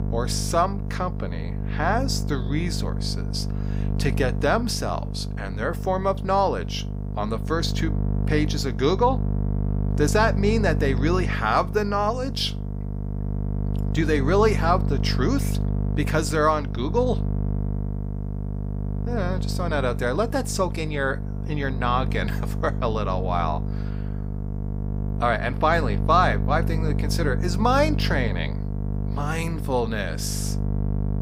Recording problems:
electrical hum; noticeable; throughout; 50 Hz, 15 dB below the speech

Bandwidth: 15.5 kHz